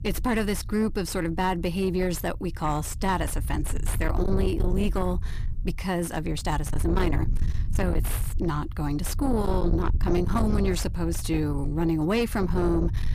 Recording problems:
distortion; slight; 10 dB below the speech
low rumble; noticeable; throughout; 10 dB below the speech

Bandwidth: 15 kHz